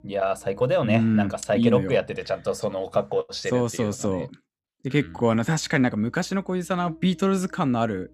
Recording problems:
electrical hum; faint; until 2.5 s and from 5 s on; 60 Hz, 30 dB below the speech

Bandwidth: 13.5 kHz